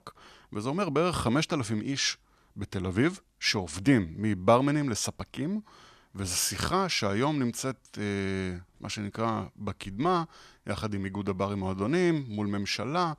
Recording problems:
none

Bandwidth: 14 kHz